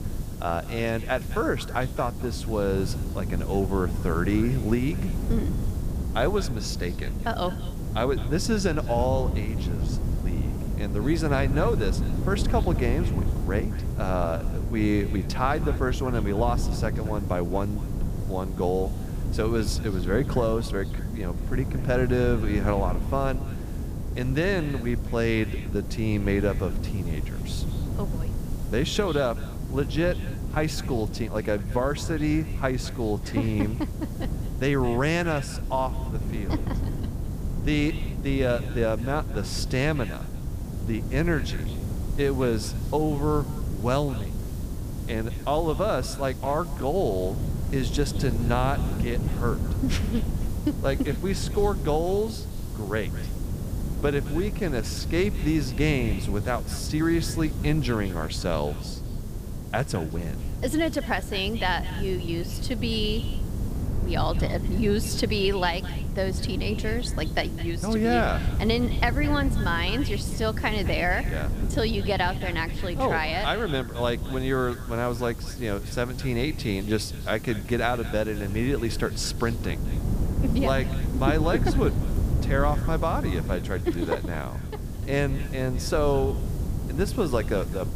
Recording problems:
echo of what is said; faint; throughout; 210 ms later, 20 dB below the speech
wind noise on the microphone; occasional gusts; 15 dB below the speech
hiss; faint; throughout; 20 dB below the speech

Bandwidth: 15 kHz